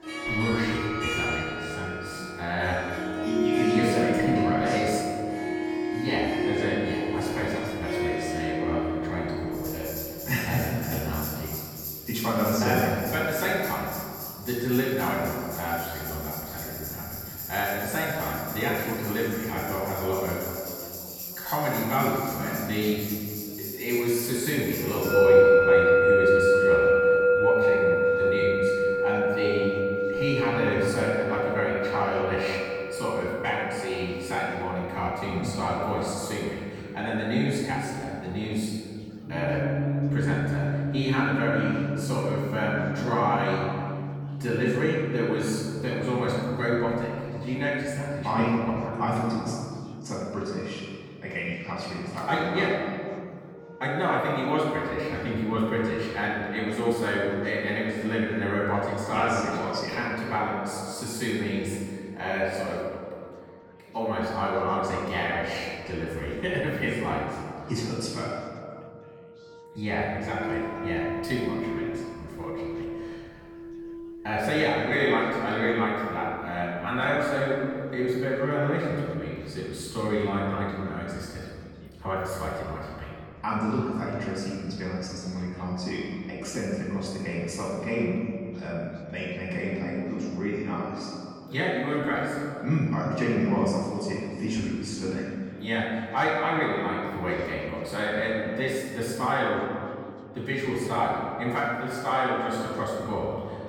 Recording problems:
room echo; strong; dies away in 2.1 s
off-mic speech; far
background music; very loud; throughout; as loud as the speech
chatter from many people; faint; throughout; 25 dB below the speech

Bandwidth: 18.5 kHz